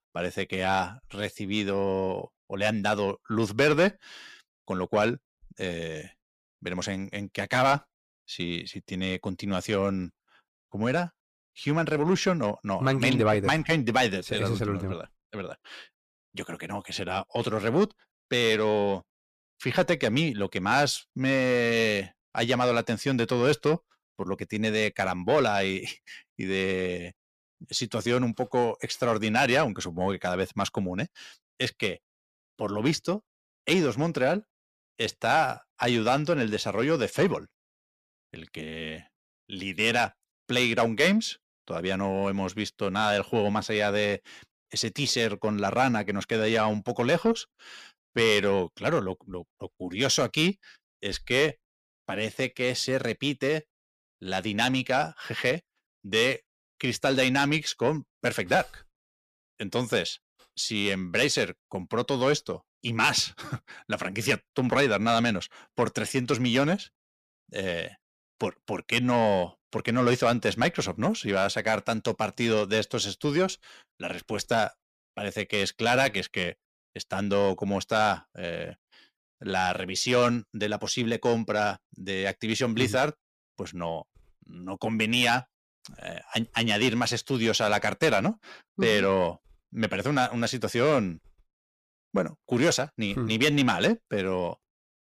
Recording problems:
distortion; slight; 10 dB below the speech

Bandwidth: 14.5 kHz